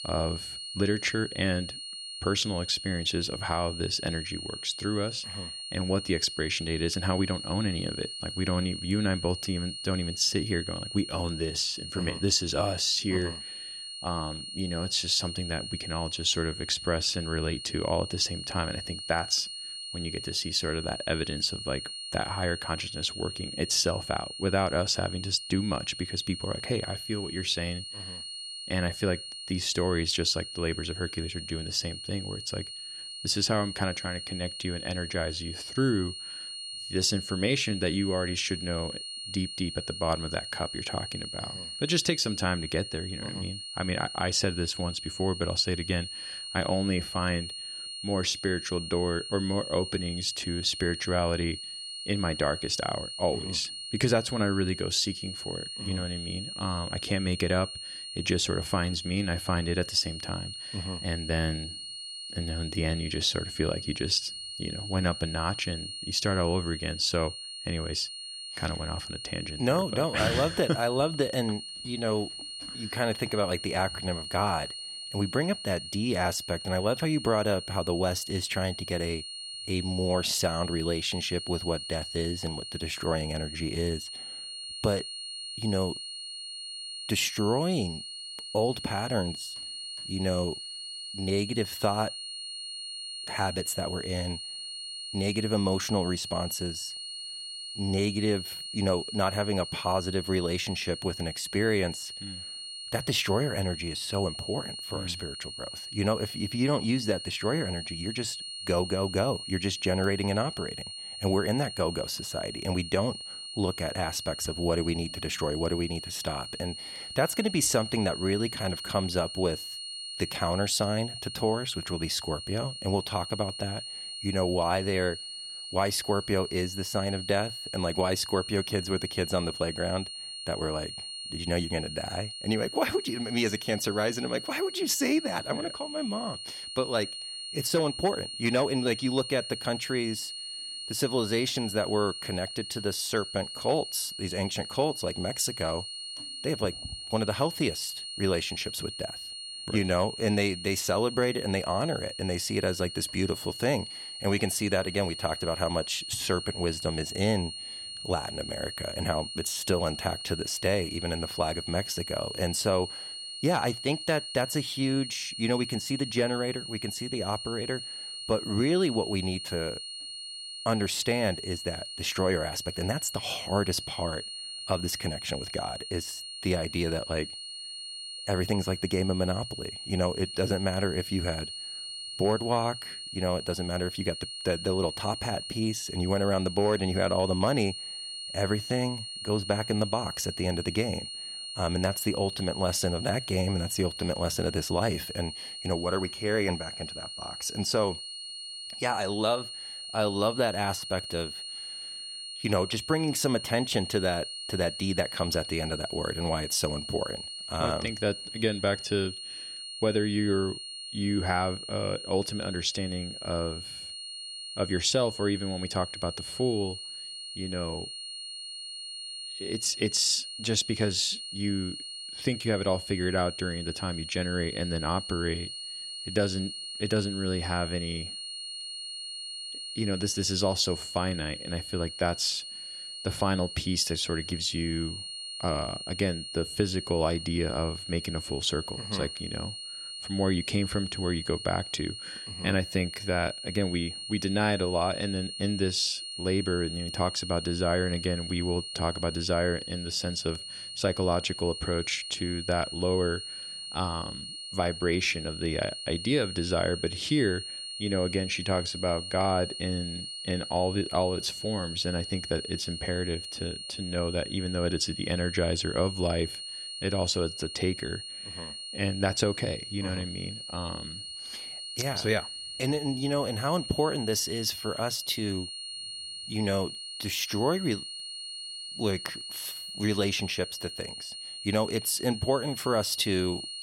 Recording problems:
high-pitched whine; loud; throughout; 4.5 kHz, 7 dB below the speech

